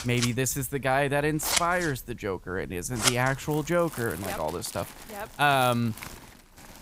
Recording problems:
household noises; loud; throughout; 5 dB below the speech

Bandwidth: 15.5 kHz